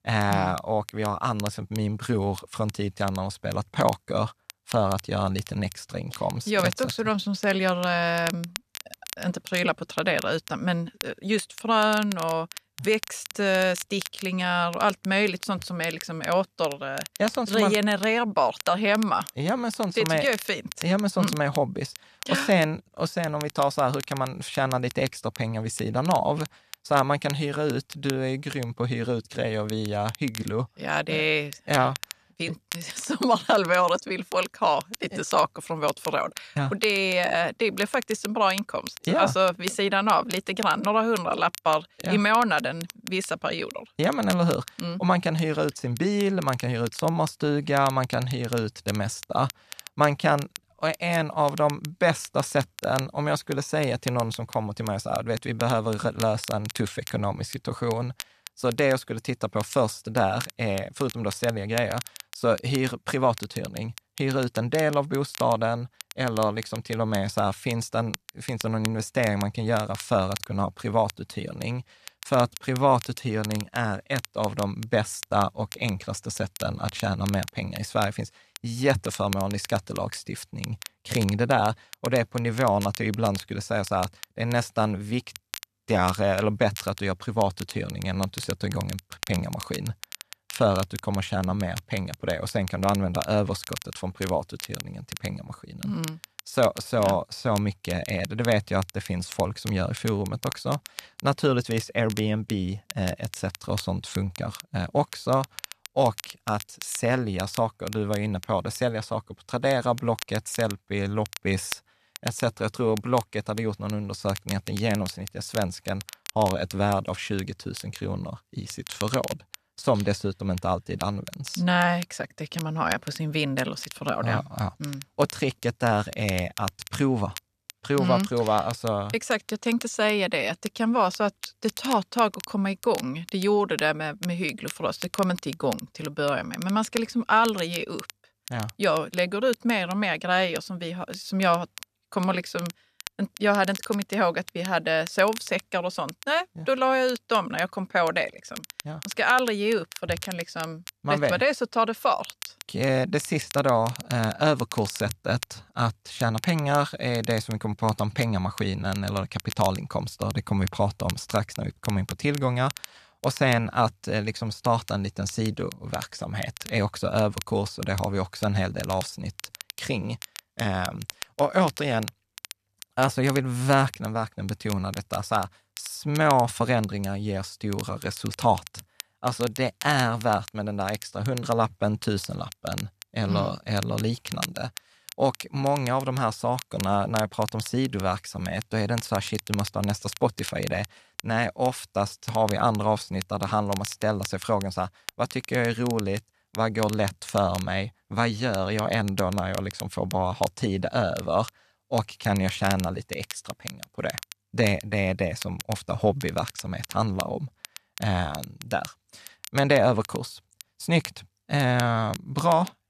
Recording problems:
crackle, like an old record; noticeable; 15 dB below the speech

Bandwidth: 14 kHz